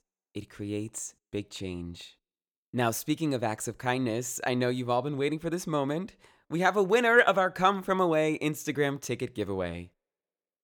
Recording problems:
none

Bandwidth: 17.5 kHz